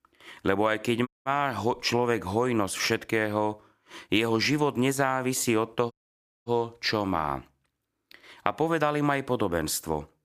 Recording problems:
audio cutting out; at 1 s and at 6 s for 0.5 s

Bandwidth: 15 kHz